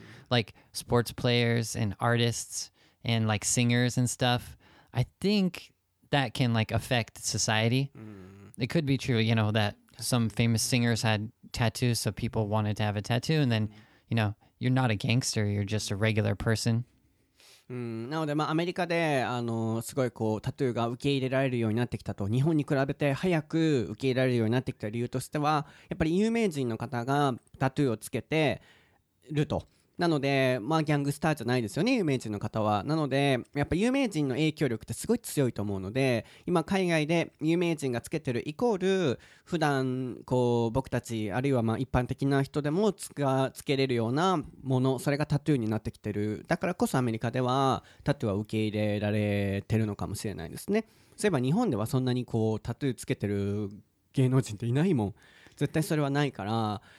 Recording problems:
none

